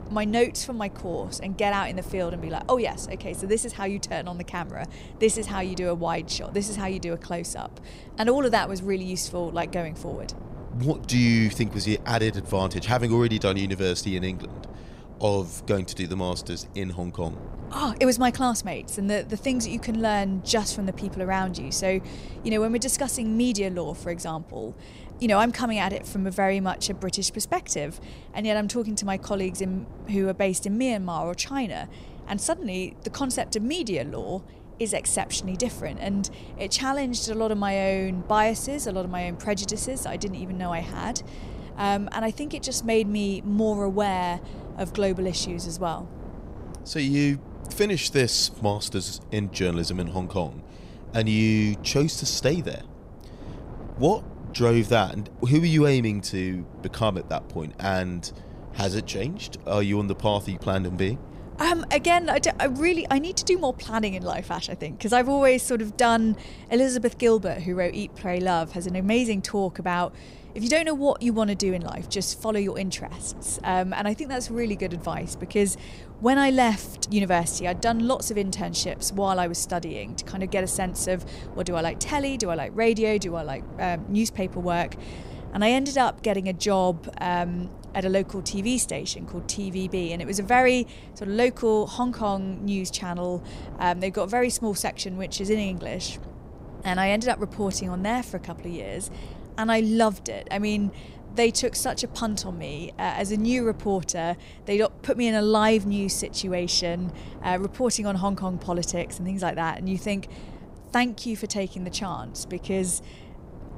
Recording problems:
wind noise on the microphone; occasional gusts; 20 dB below the speech

